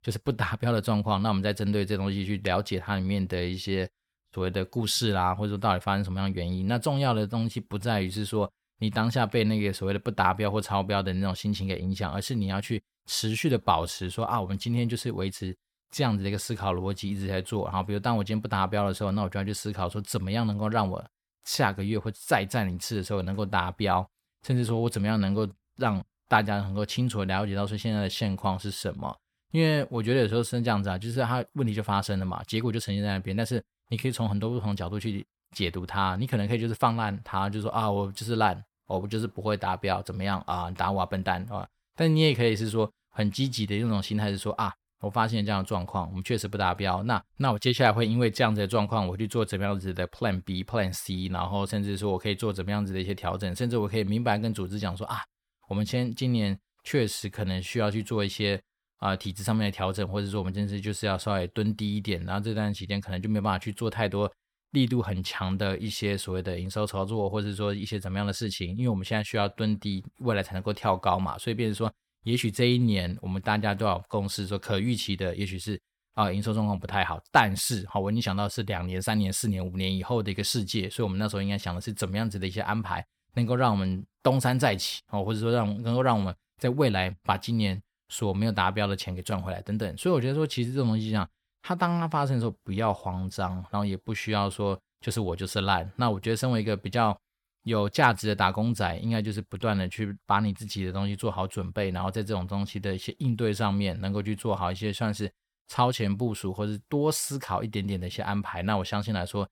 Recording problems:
none

